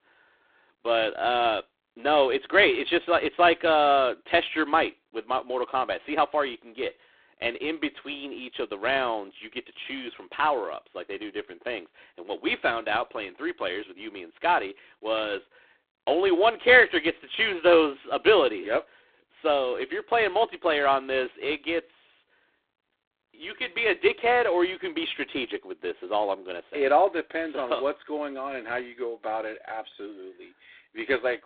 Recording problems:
phone-call audio; poor line

